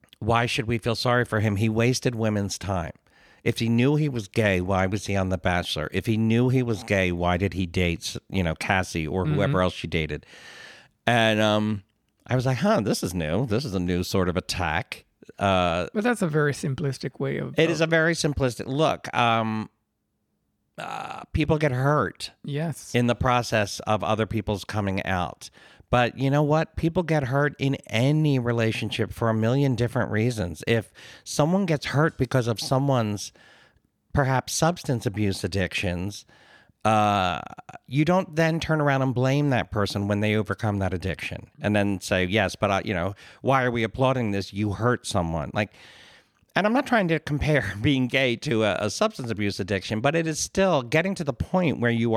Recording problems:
abrupt cut into speech; at the end

